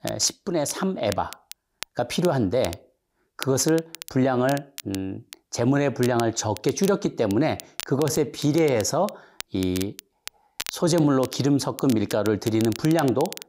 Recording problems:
crackle, like an old record; noticeable; 15 dB below the speech

